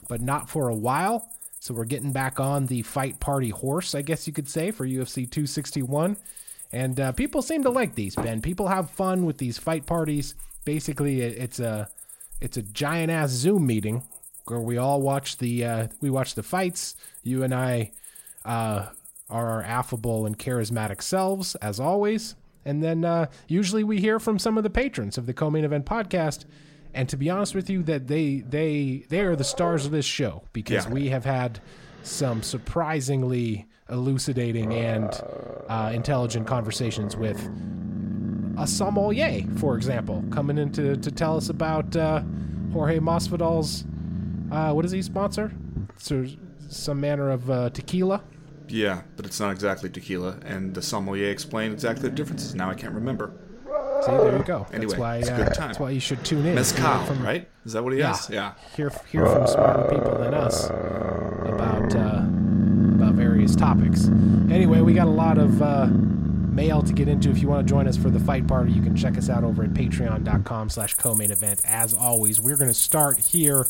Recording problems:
animal sounds; very loud; throughout; 3 dB above the speech

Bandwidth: 16 kHz